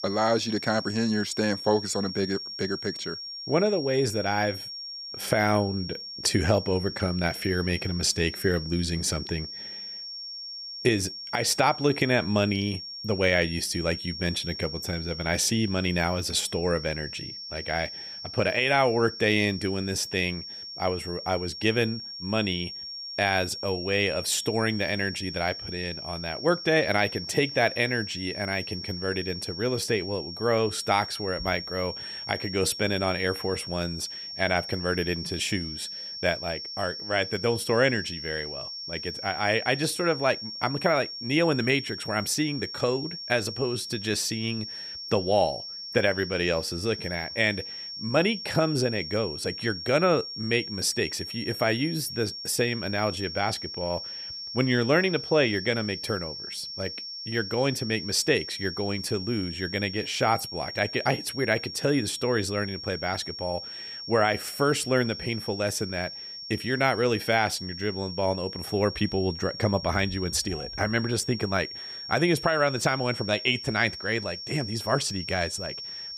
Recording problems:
high-pitched whine; loud; throughout; 5.5 kHz, 8 dB below the speech

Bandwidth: 14.5 kHz